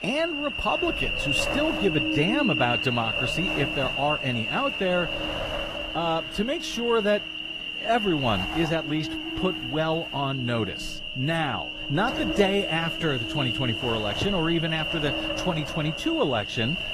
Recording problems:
garbled, watery; slightly; nothing above 15 kHz
wind noise on the microphone; heavy; 10 dB below the speech
animal sounds; loud; throughout; 1 dB below the speech
traffic noise; faint; throughout; 20 dB below the speech

